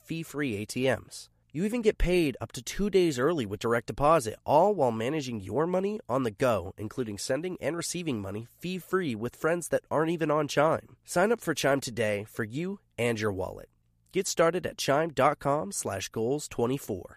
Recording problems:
none

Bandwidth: 14.5 kHz